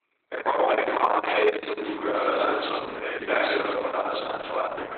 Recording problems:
room echo; strong; dies away in 1.5 s
off-mic speech; far
garbled, watery; badly; nothing above 4 kHz
thin; very; fading below 300 Hz

